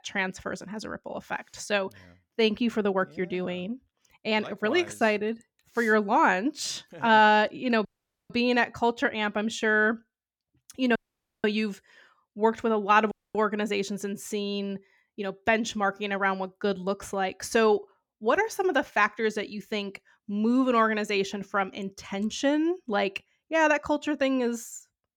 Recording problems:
audio cutting out; at 8 s, at 11 s and at 13 s

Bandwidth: 18 kHz